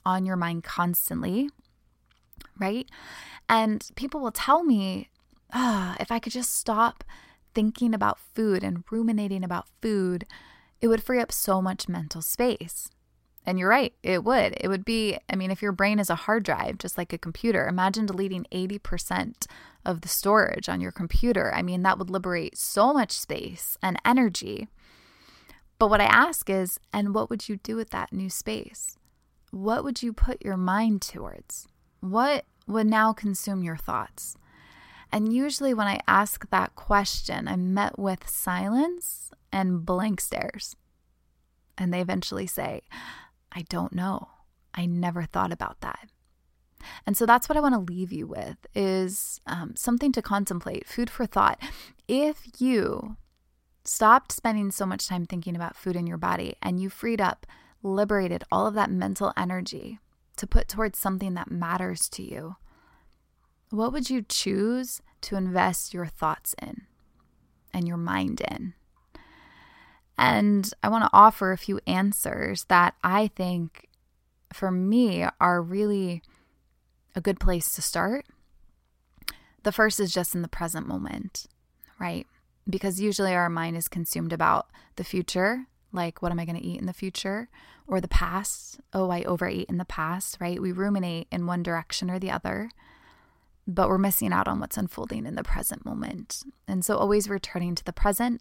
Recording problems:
none

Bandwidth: 16 kHz